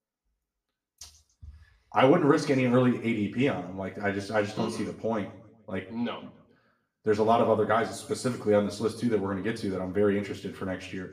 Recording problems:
room echo; slight; dies away in 0.6 s
off-mic speech; somewhat distant

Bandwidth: 15 kHz